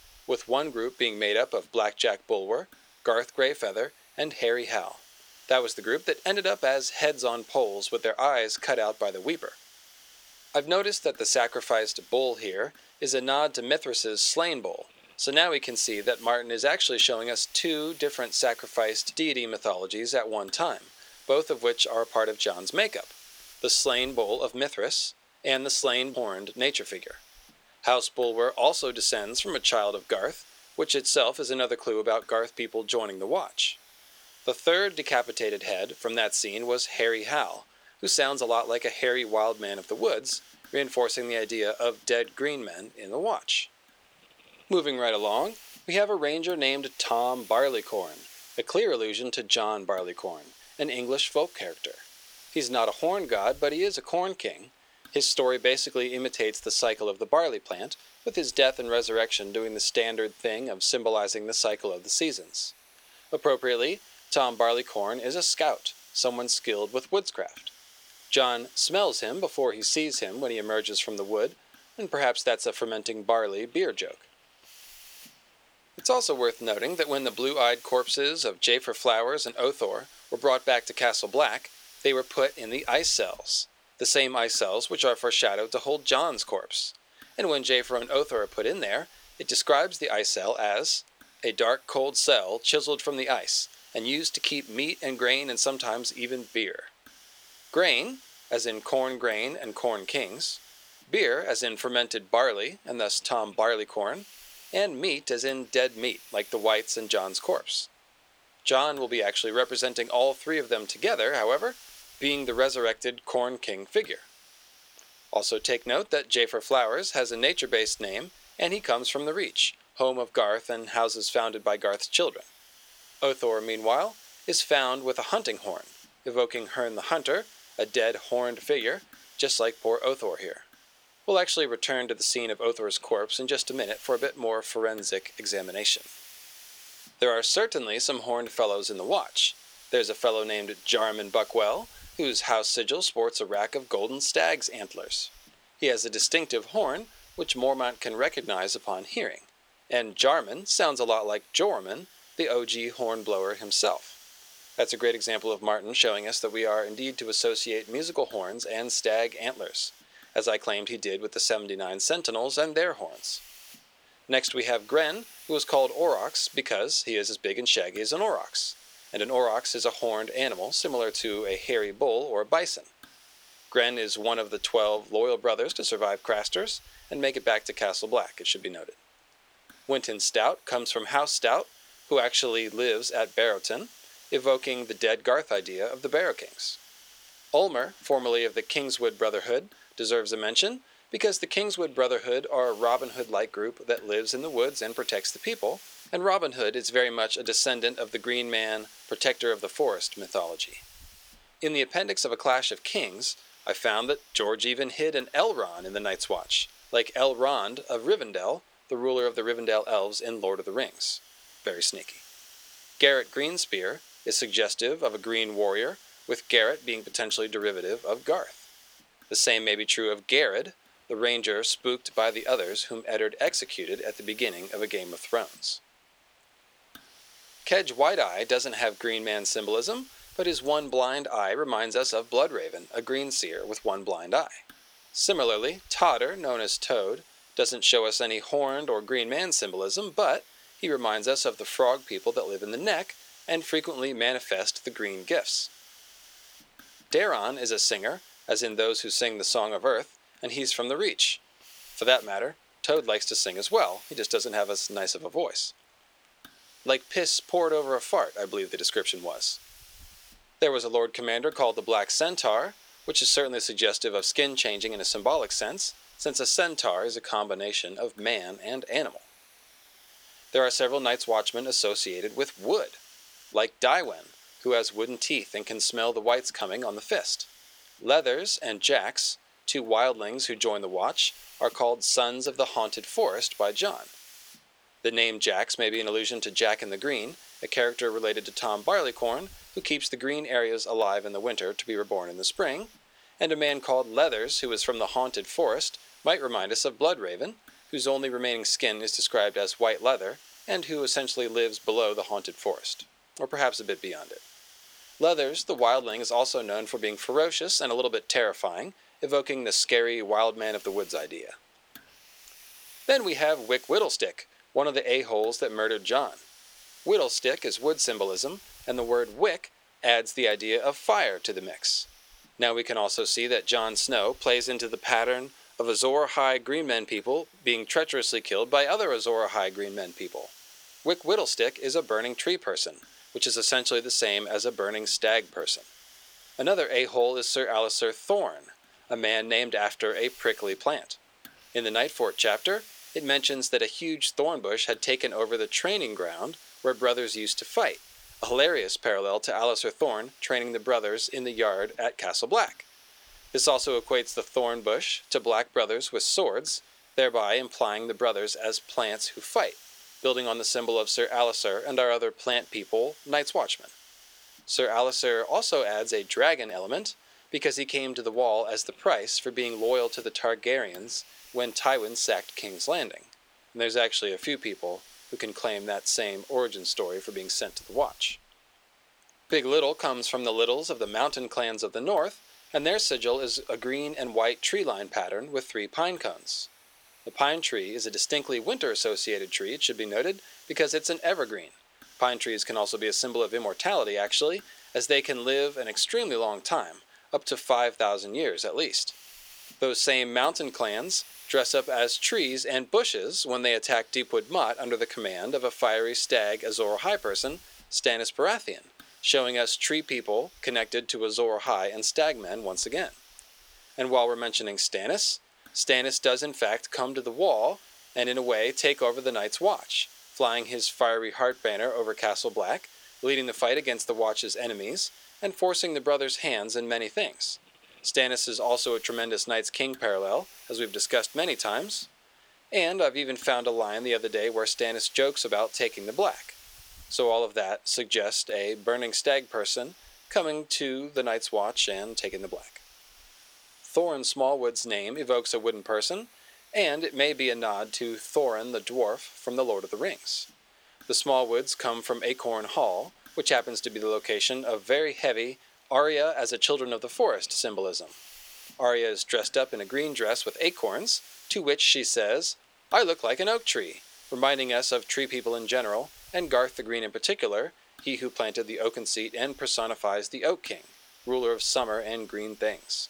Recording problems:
thin; somewhat; fading below 300 Hz
hiss; faint; throughout; 25 dB below the speech

